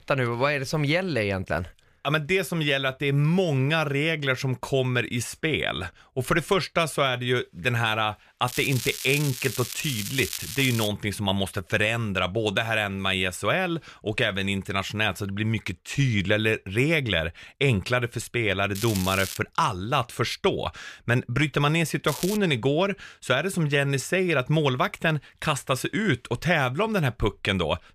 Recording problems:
crackling; loud; from 8.5 to 11 s, at 19 s and at 22 s; 8 dB below the speech

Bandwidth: 14.5 kHz